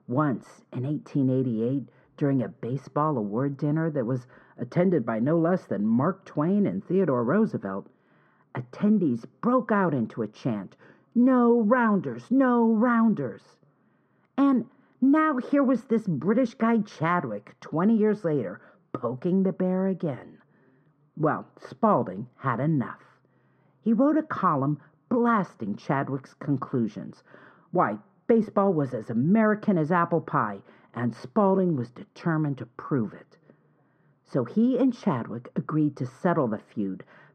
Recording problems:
muffled; very; fading above 1 kHz

